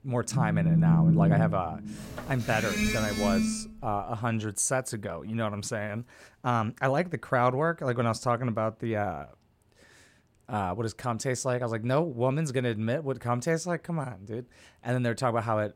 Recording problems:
alarms or sirens; very loud; until 3.5 s; 3 dB above the speech

